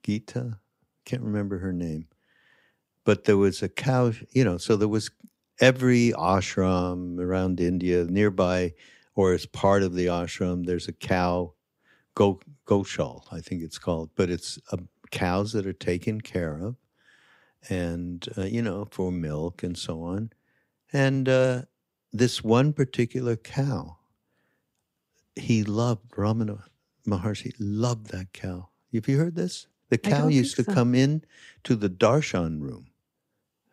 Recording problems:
none

